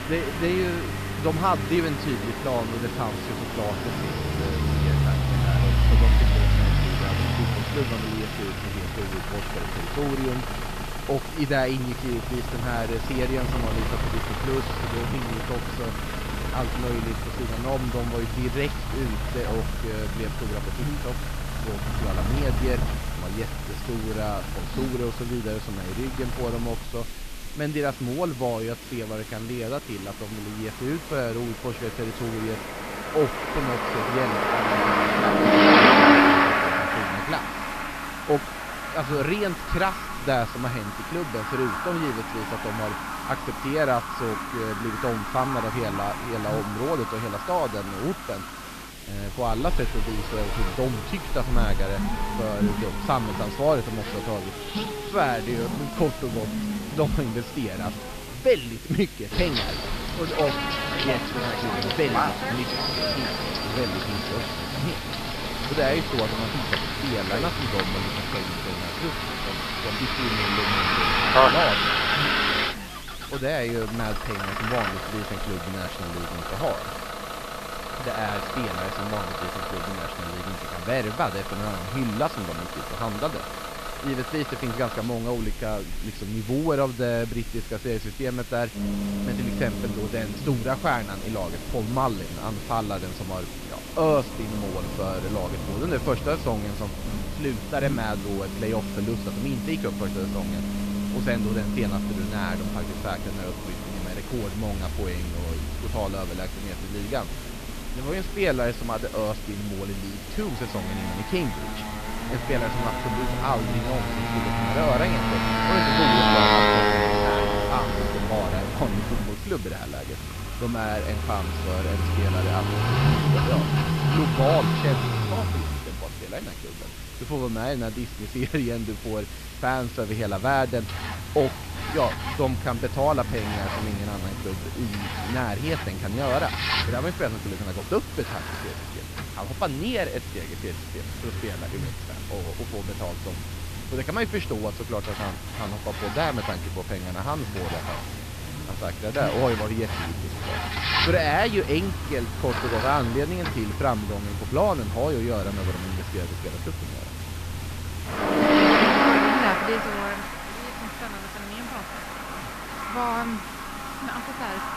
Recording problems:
high frequencies cut off; noticeable; nothing above 5.5 kHz
traffic noise; very loud; throughout; 2 dB above the speech
hiss; noticeable; throughout; 10 dB below the speech
electrical hum; faint; throughout; 50 Hz, 25 dB below the speech

